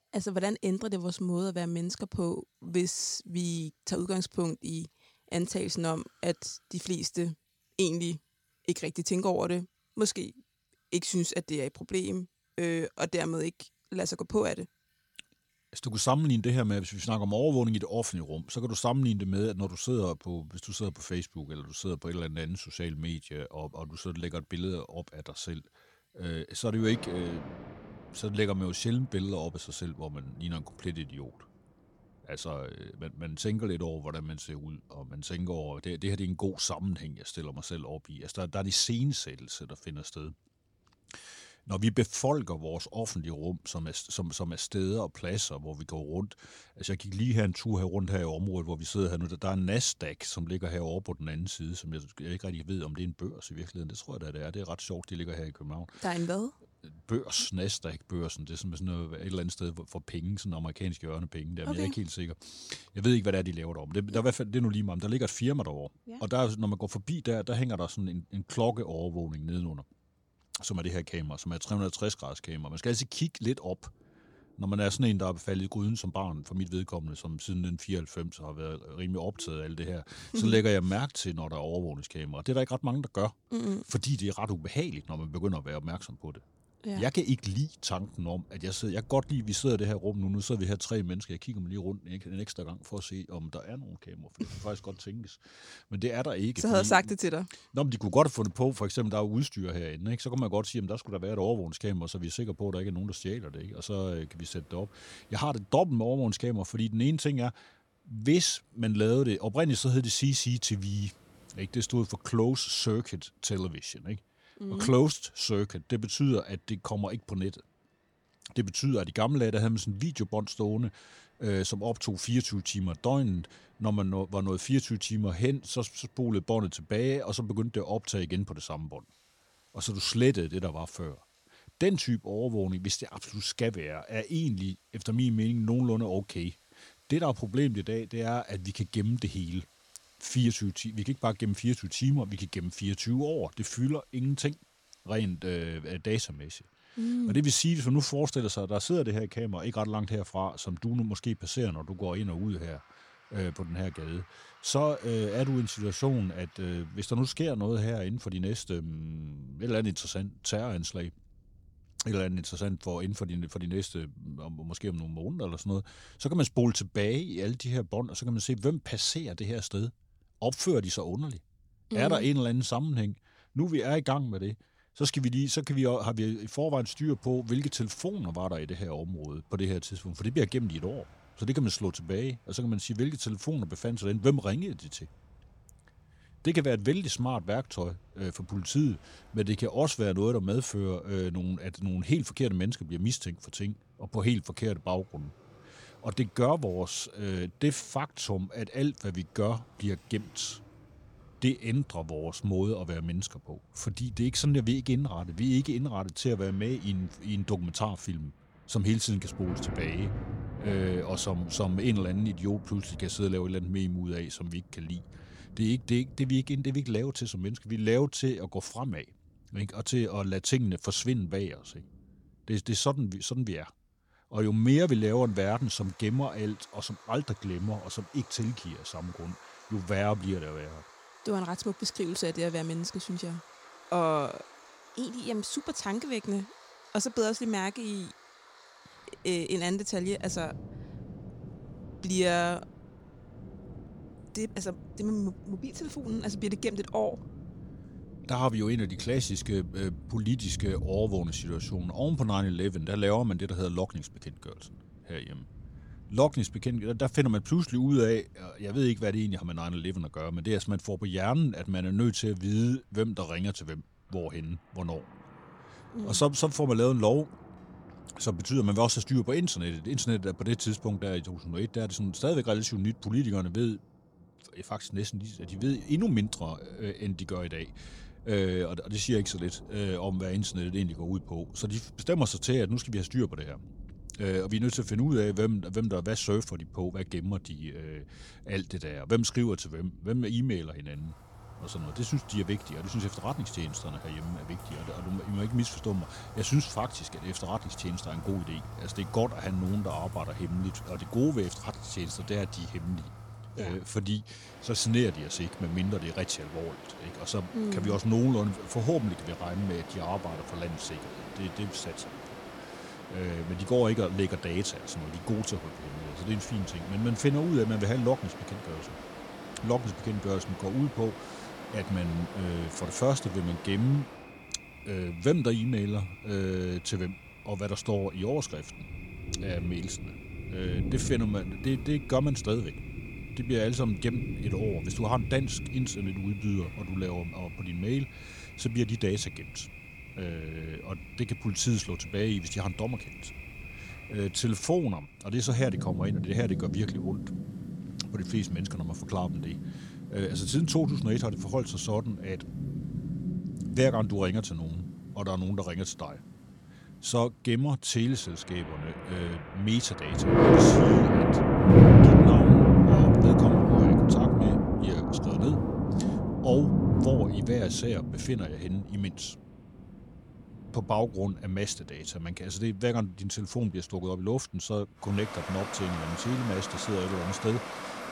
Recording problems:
rain or running water; very loud; throughout; 2 dB above the speech

